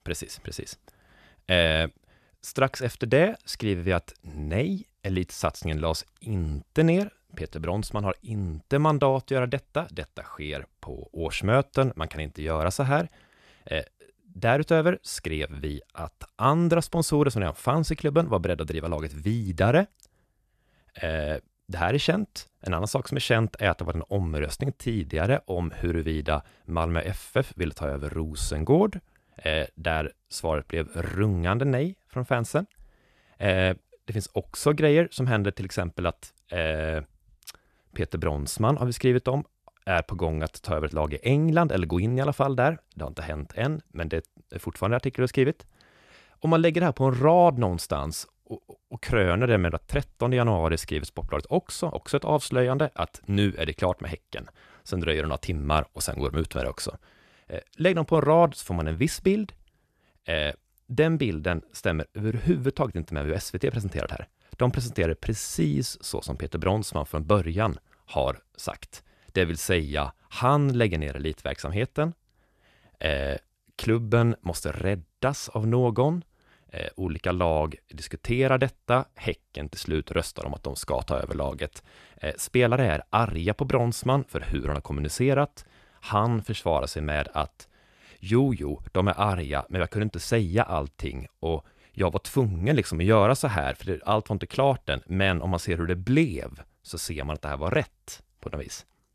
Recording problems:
none

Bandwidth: 14 kHz